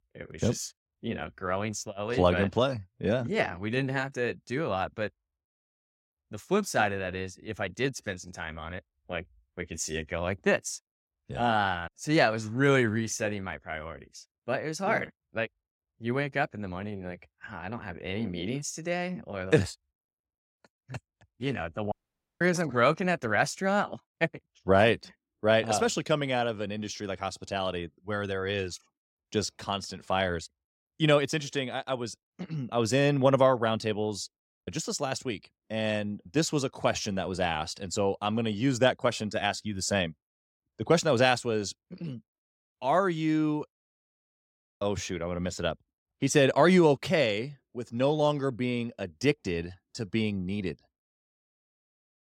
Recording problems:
audio cutting out; at 22 s

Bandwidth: 16 kHz